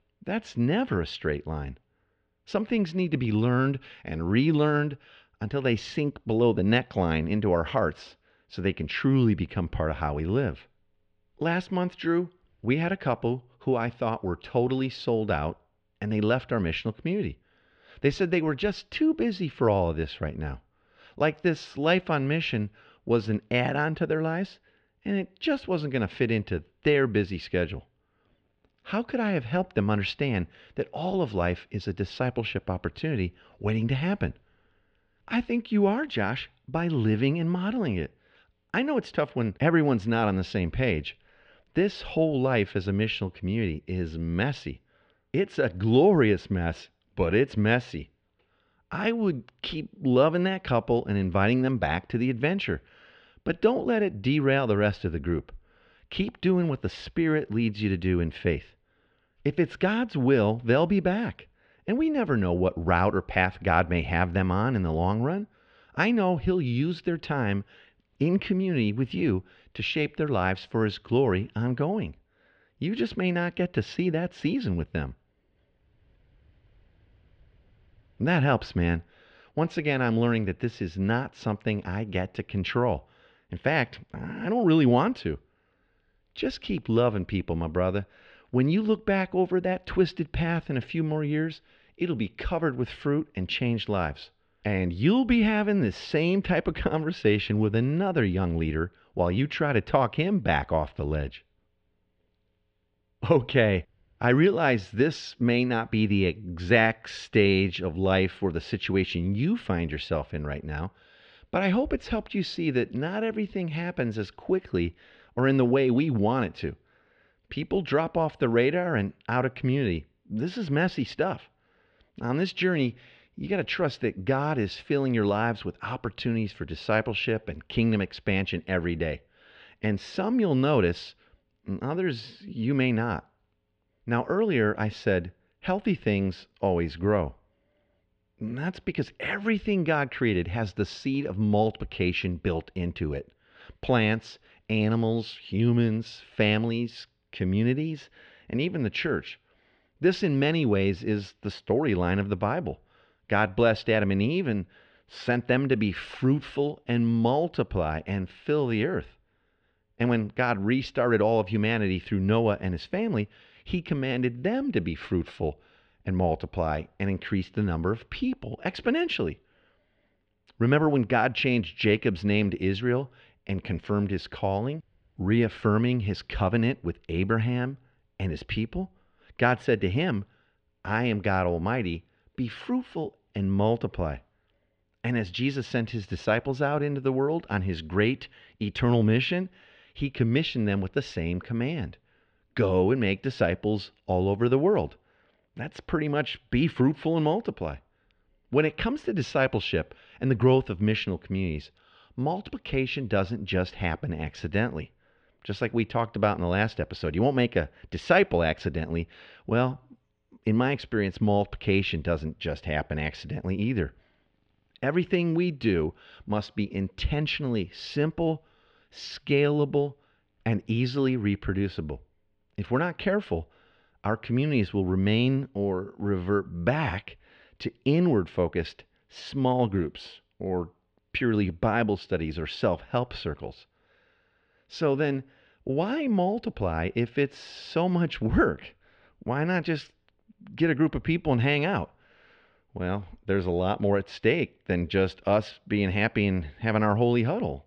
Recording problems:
muffled; very; fading above 3 kHz

